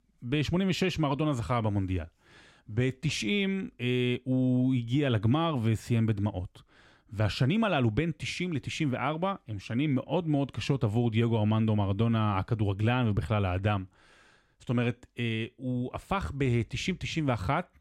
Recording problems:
none

